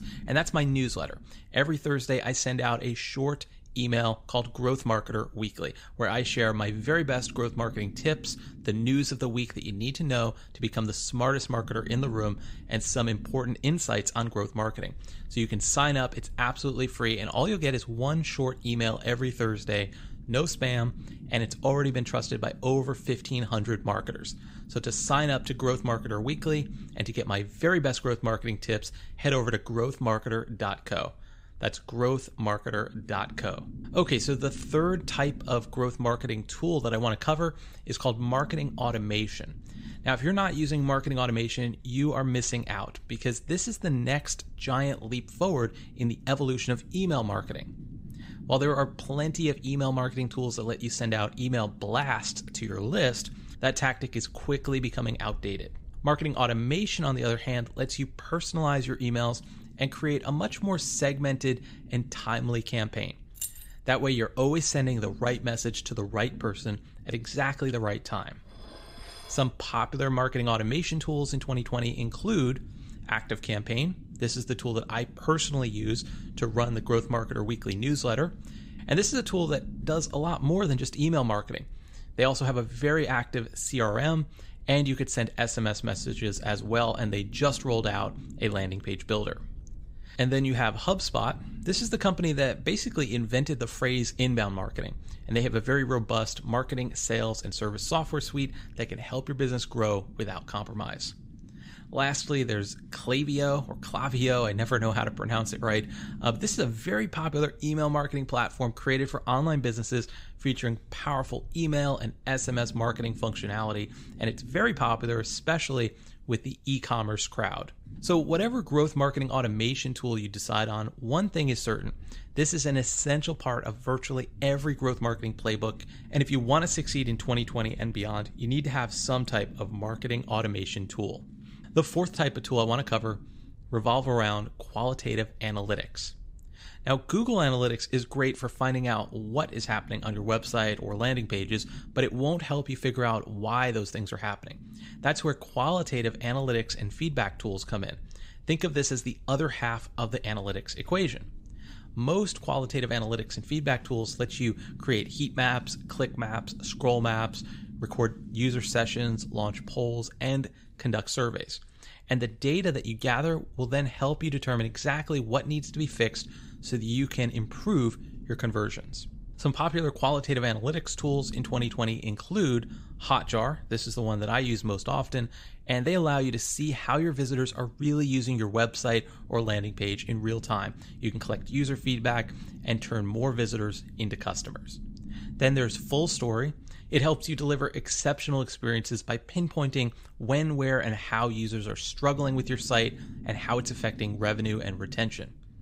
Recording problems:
low rumble; faint; throughout; 25 dB below the speech
jangling keys; noticeable; at 1:03; peak 7 dB below the speech
clattering dishes; faint; from 1:08 to 1:10; peak 15 dB below the speech

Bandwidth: 15.5 kHz